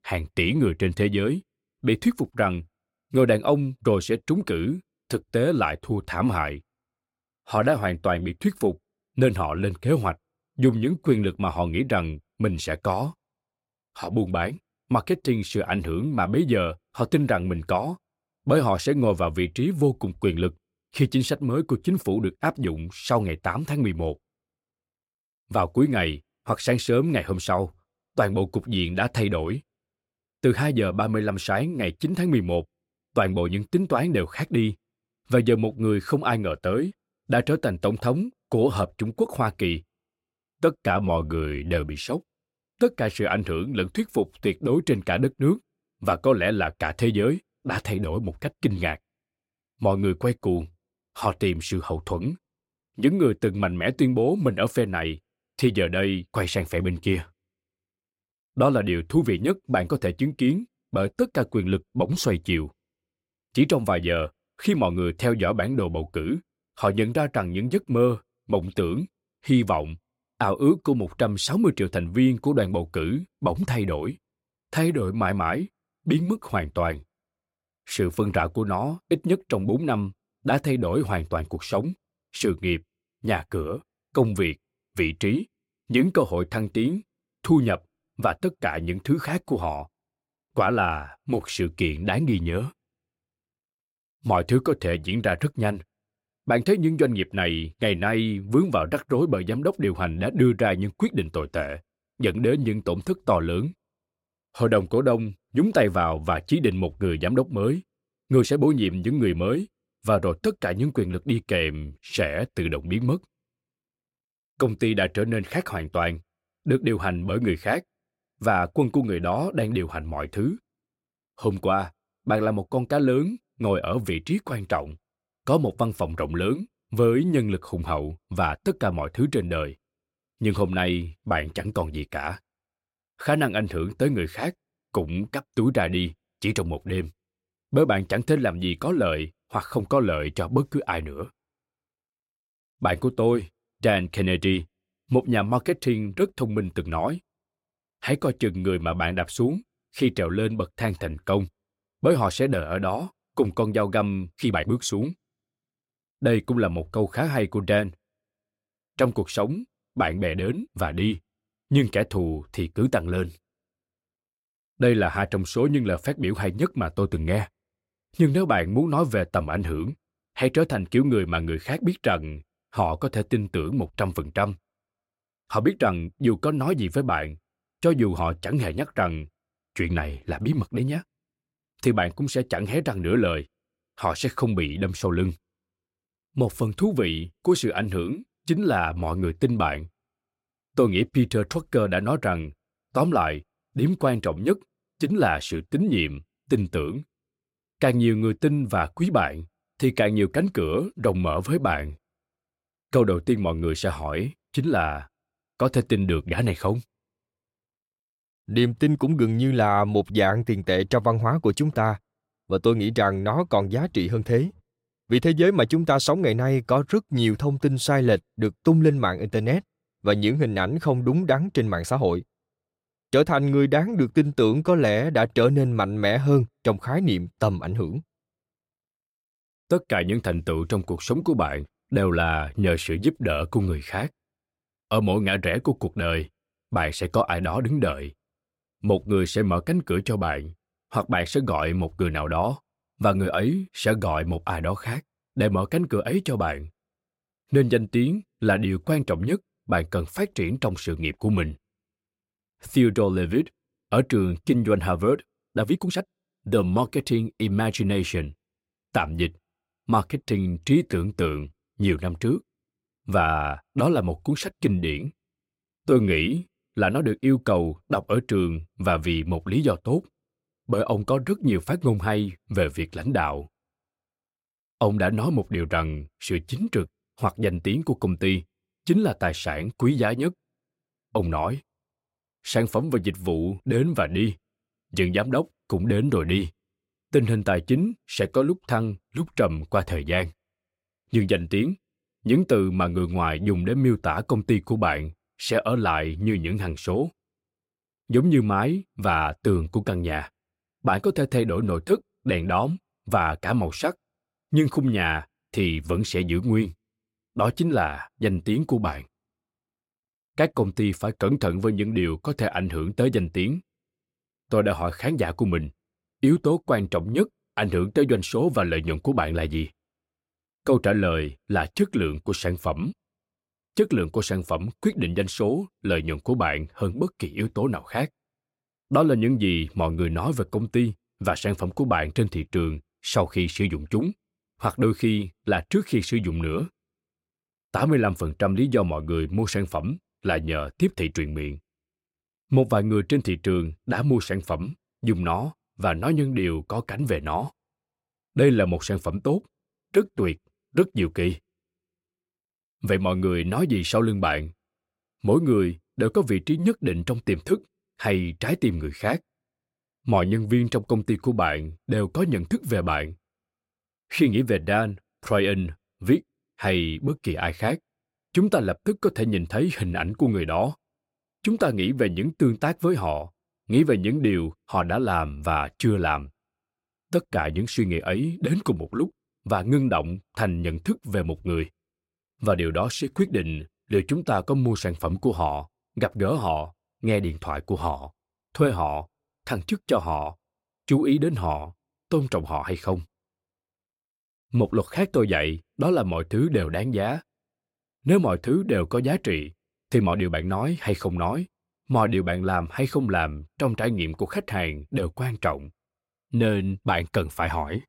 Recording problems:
uneven, jittery; strongly; from 11 s to 6:40

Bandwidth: 16 kHz